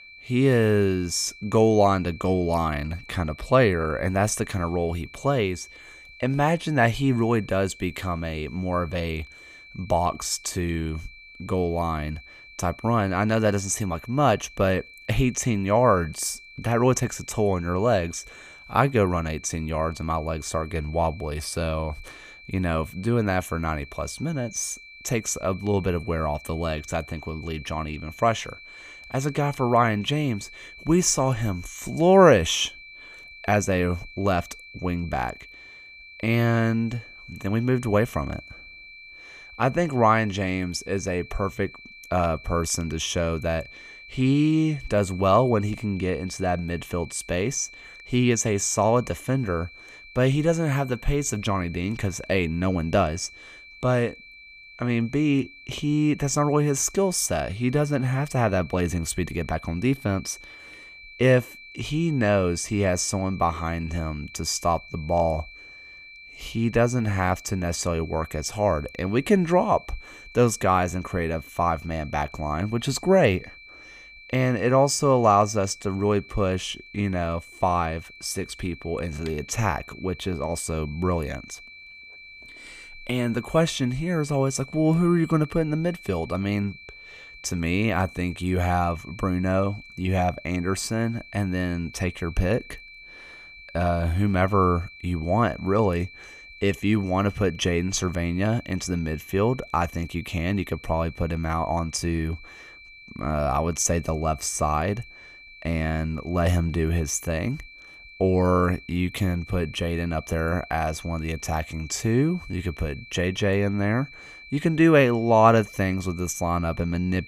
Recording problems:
high-pitched whine; noticeable; throughout; 2.5 kHz, 20 dB below the speech

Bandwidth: 15 kHz